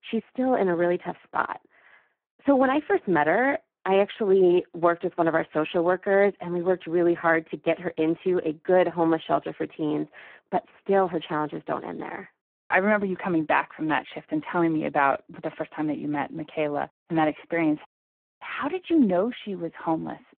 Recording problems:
phone-call audio; poor line

